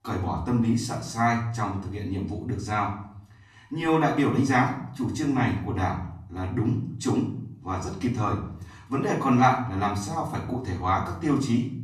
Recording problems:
off-mic speech; far
room echo; slight; dies away in 0.5 s

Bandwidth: 14 kHz